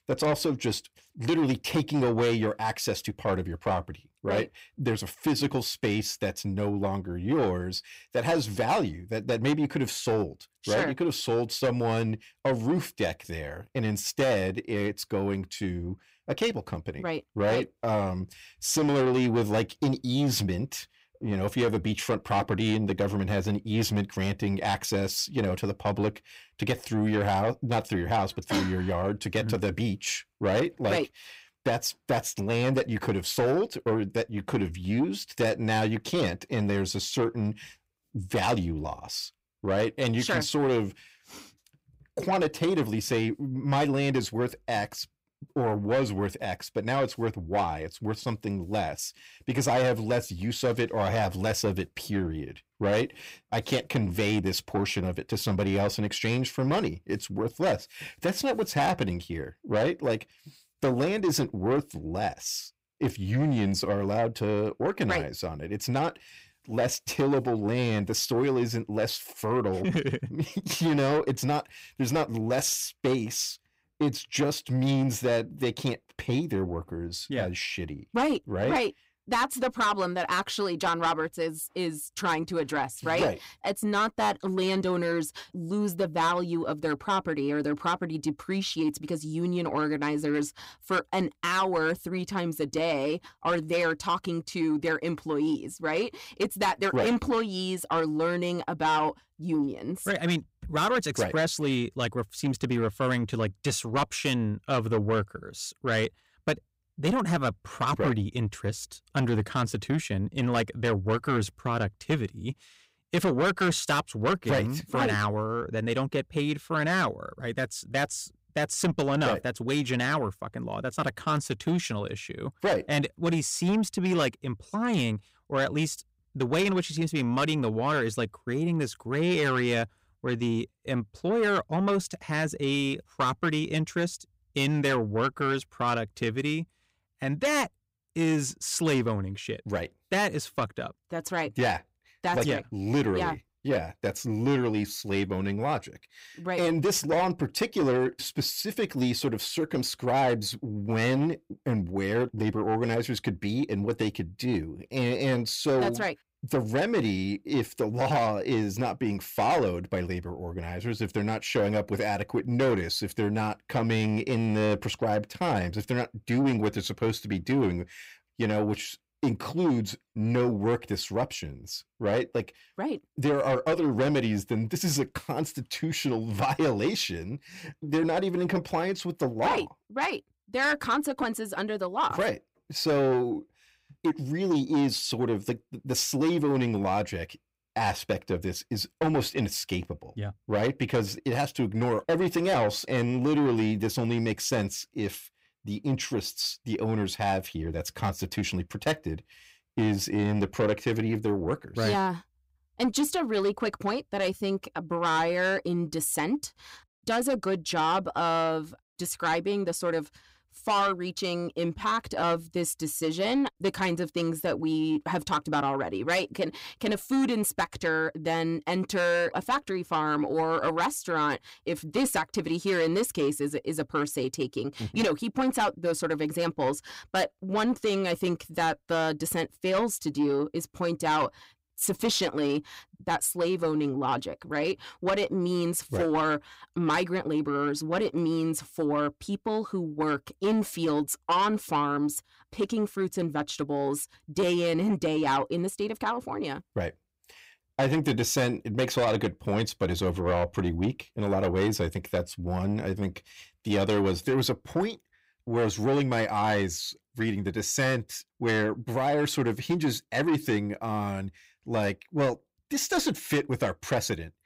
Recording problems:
distortion; slight; 10 dB below the speech

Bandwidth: 15.5 kHz